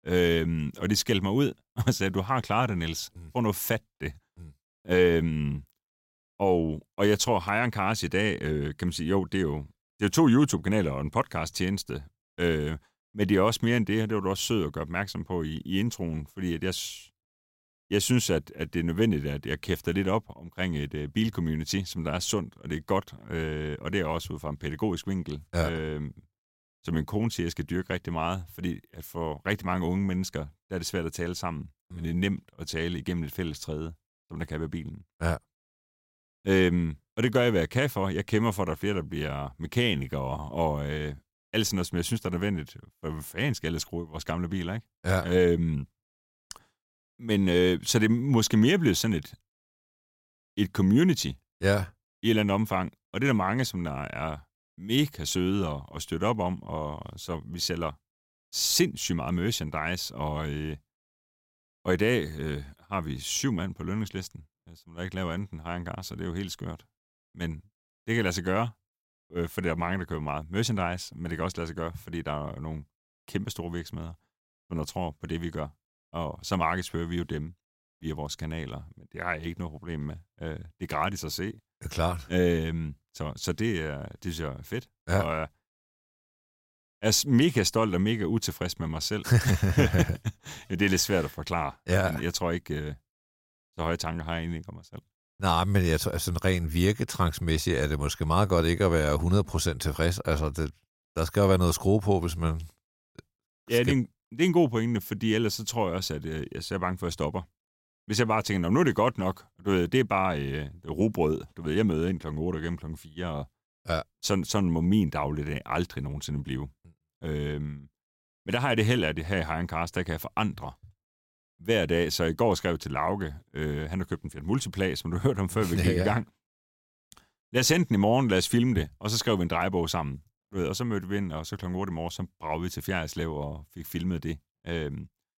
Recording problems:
none

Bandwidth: 16 kHz